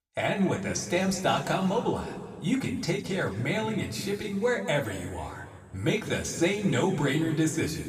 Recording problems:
room echo; slight; dies away in 2 s
off-mic speech; somewhat distant

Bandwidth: 15 kHz